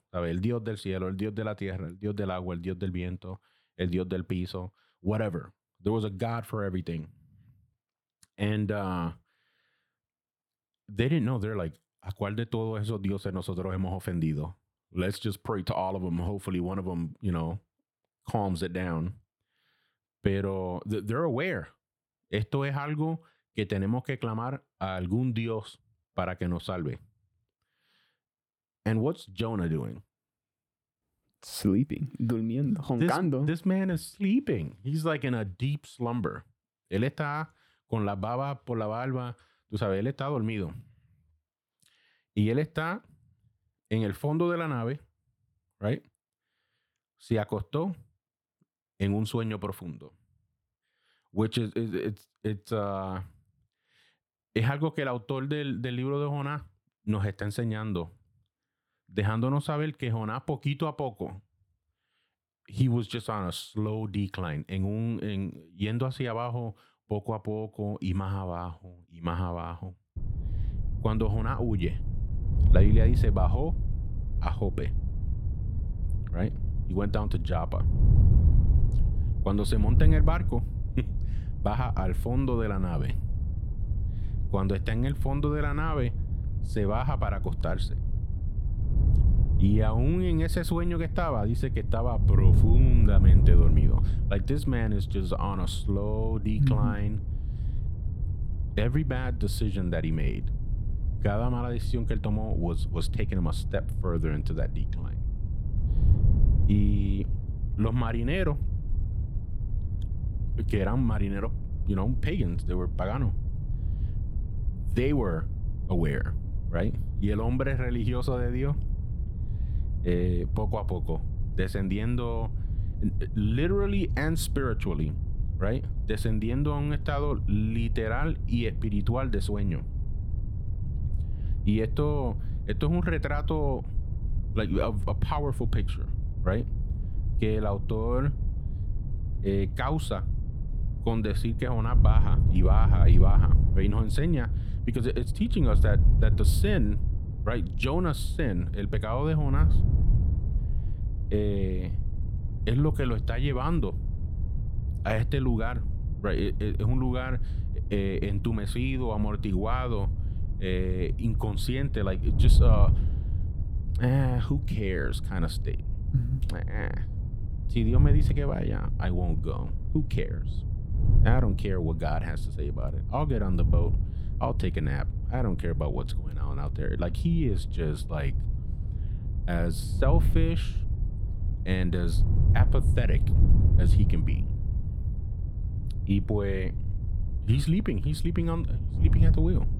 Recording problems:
wind noise on the microphone; occasional gusts; from 1:10 on; 10 dB below the speech

